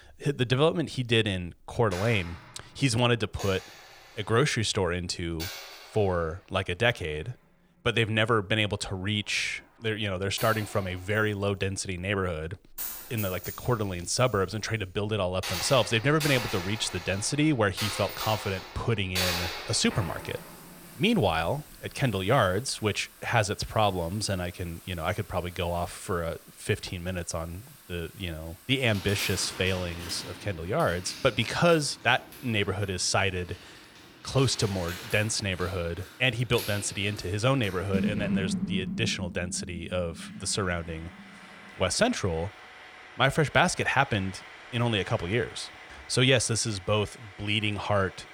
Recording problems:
household noises; noticeable; throughout; 10 dB below the speech

